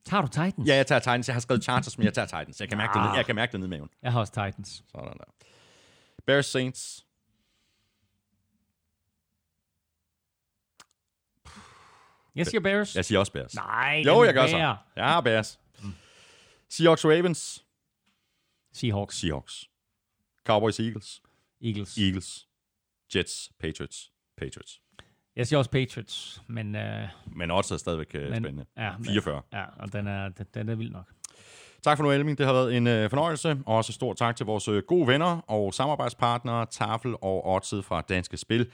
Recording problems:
none

